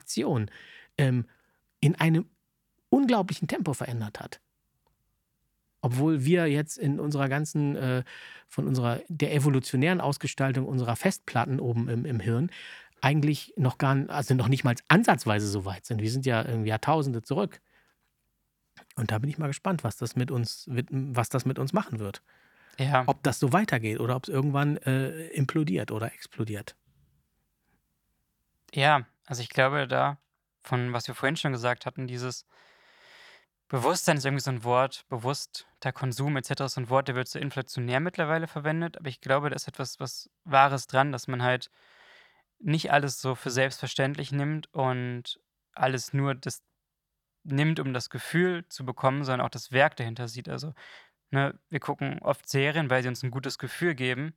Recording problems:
none

